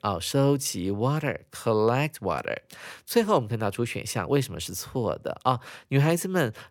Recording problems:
none

